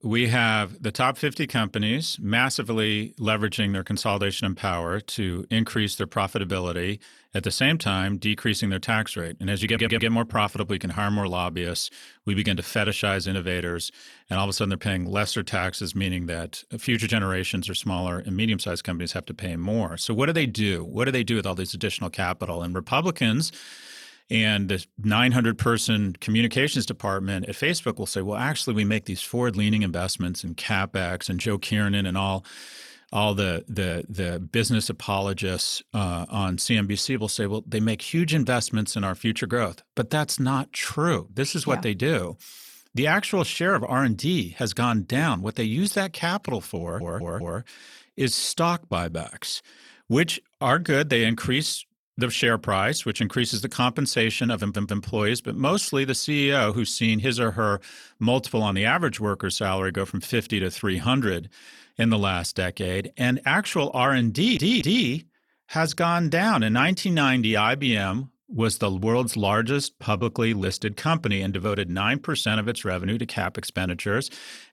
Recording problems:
audio stuttering; 4 times, first at 9.5 s

